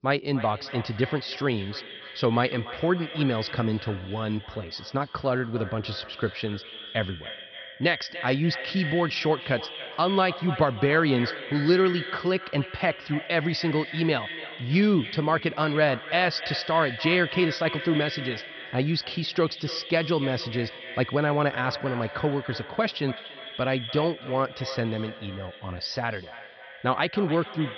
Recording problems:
echo of what is said; strong; throughout; 290 ms later, 10 dB below the speech
high frequencies cut off; noticeable; nothing above 5.5 kHz

